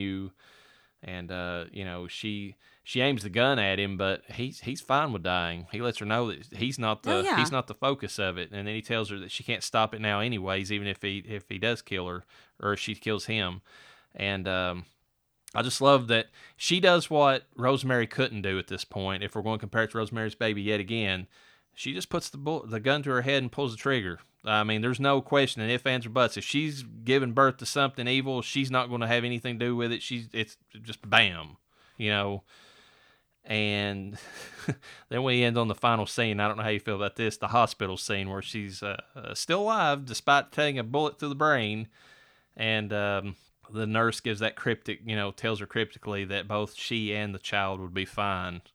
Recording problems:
abrupt cut into speech; at the start

